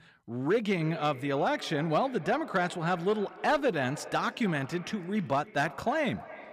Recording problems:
echo of what is said; noticeable; throughout; 300 ms later, 15 dB below the speech

